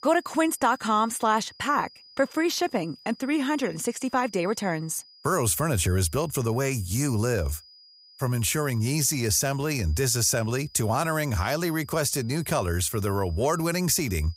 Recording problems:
high-pitched whine; faint; throughout; 5 kHz, 25 dB below the speech

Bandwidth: 15.5 kHz